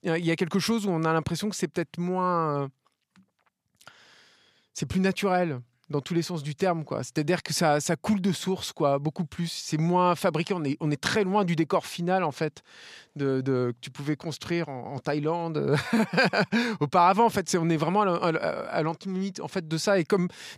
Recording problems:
none

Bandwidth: 14.5 kHz